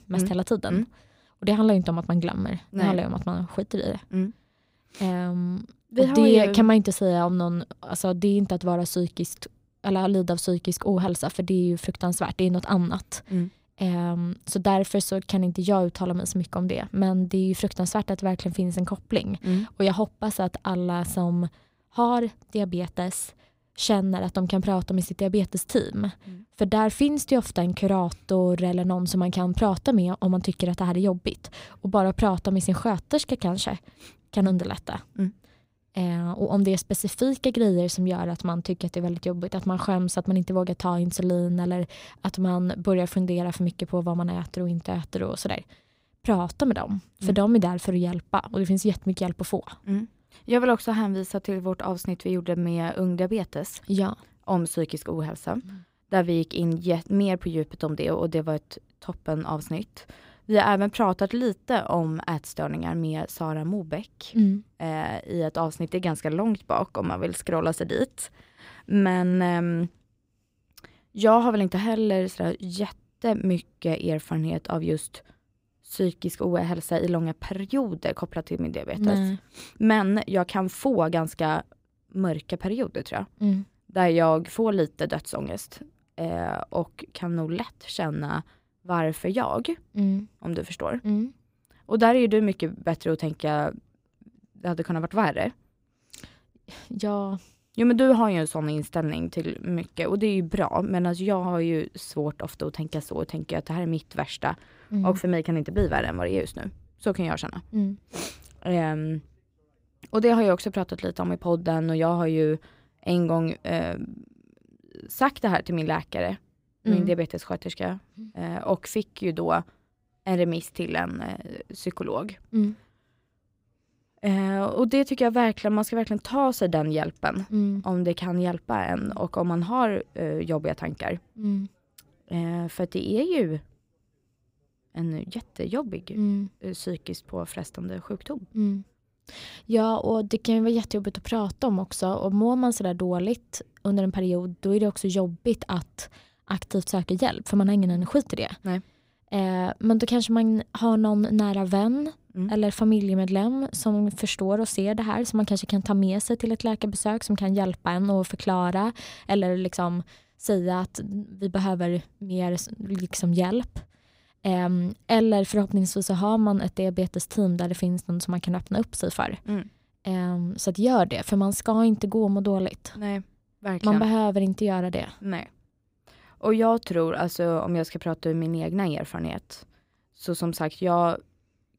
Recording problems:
none

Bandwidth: 15.5 kHz